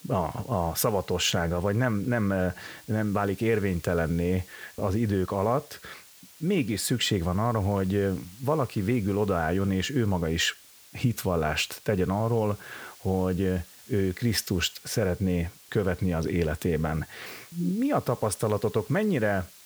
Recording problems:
hiss; faint; throughout; 20 dB below the speech

